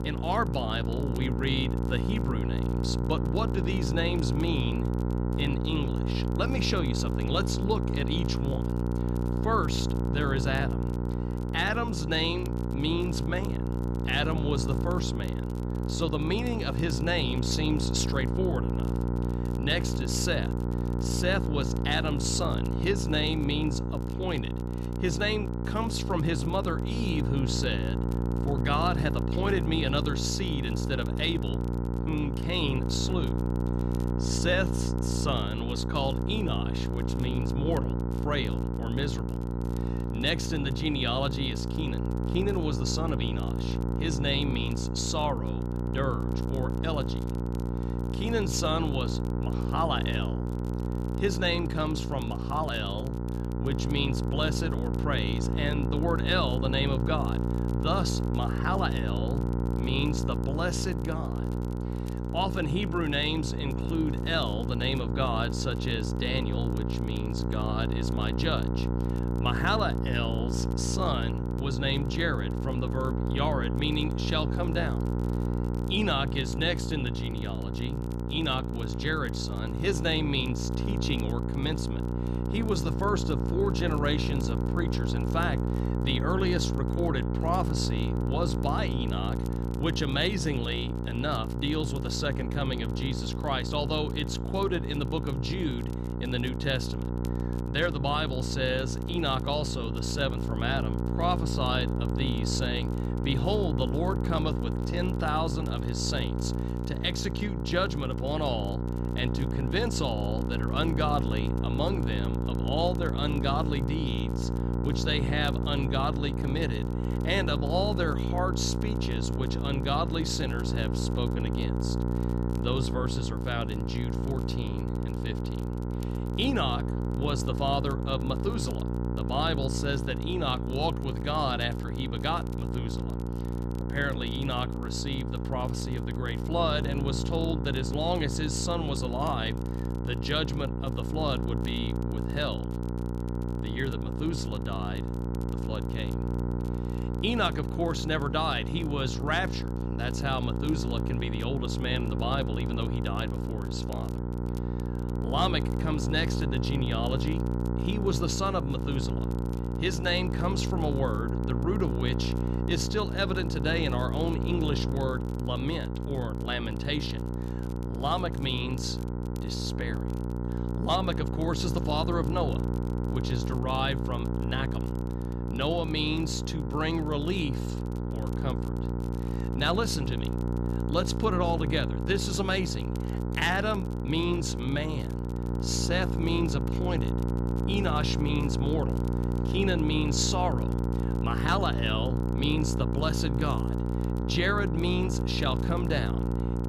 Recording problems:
electrical hum; loud; throughout; 60 Hz, 6 dB below the speech
crackle, like an old record; faint; 25 dB below the speech

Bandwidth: 14.5 kHz